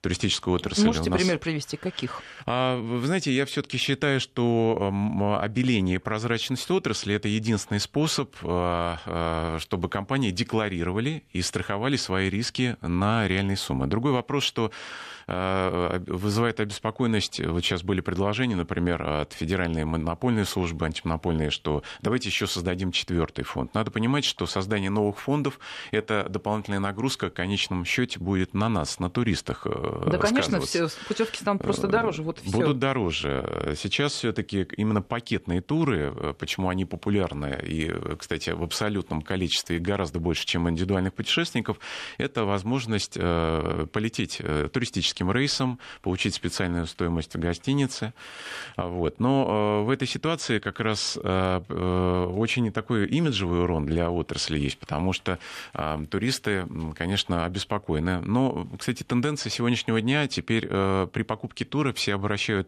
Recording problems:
none

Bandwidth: 13.5 kHz